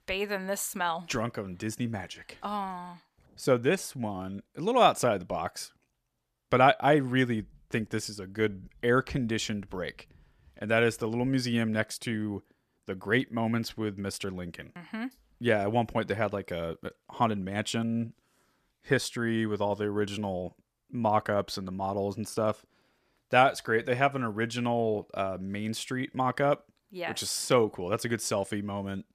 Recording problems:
none

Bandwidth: 14.5 kHz